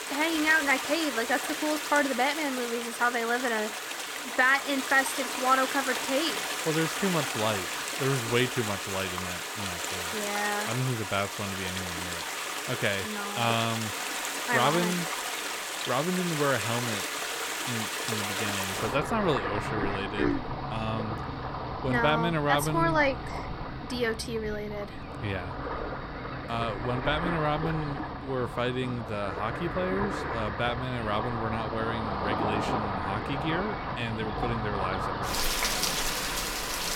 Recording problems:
rain or running water; loud; throughout; 3 dB below the speech

